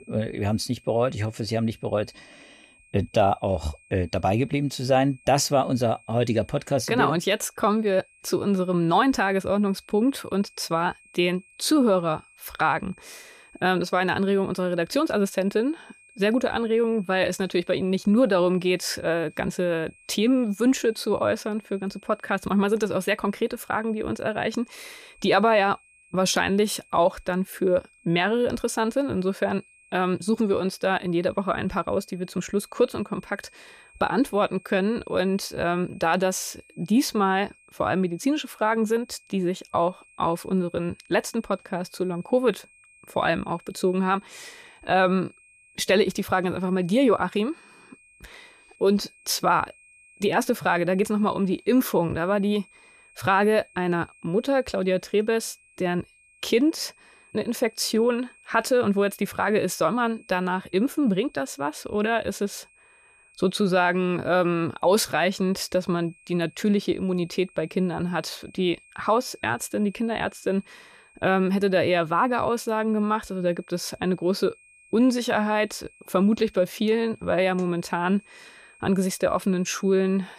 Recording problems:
high-pitched whine; faint; throughout; 2.5 kHz, 30 dB below the speech

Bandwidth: 14.5 kHz